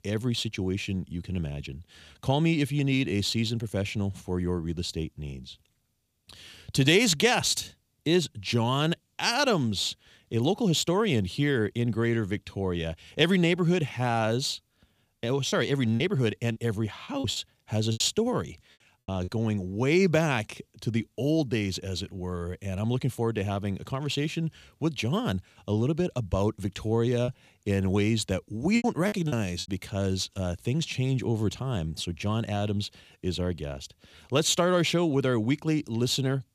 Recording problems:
choppy; very; from 15 to 19 s and from 27 to 30 s; 11% of the speech affected

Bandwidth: 15 kHz